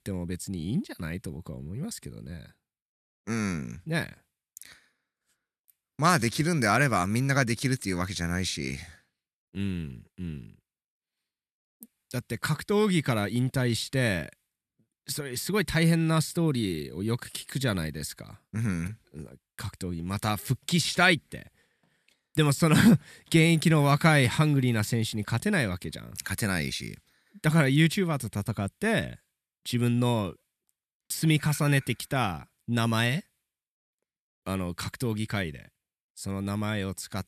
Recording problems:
none

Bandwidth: 14 kHz